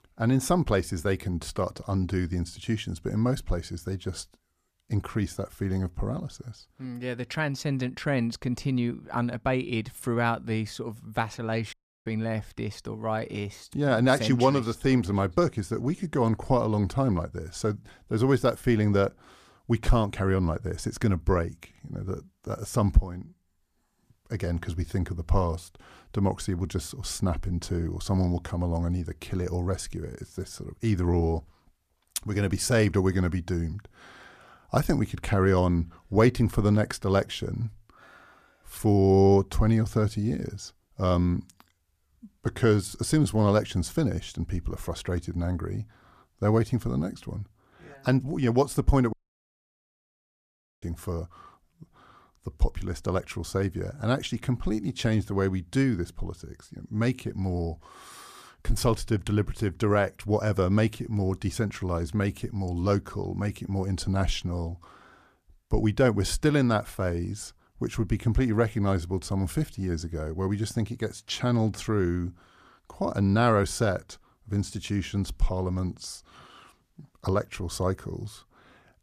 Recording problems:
audio cutting out; at 12 s and at 49 s for 1.5 s

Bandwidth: 14.5 kHz